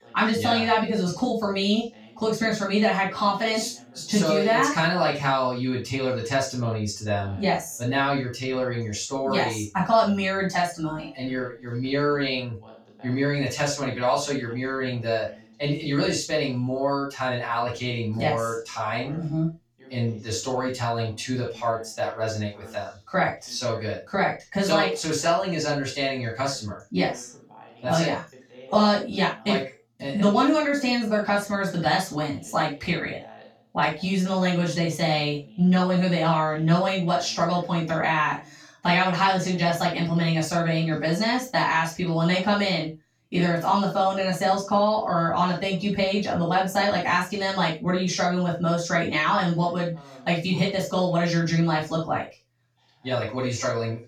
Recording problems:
off-mic speech; far
room echo; noticeable; dies away in 0.2 s
voice in the background; faint; throughout; 25 dB below the speech

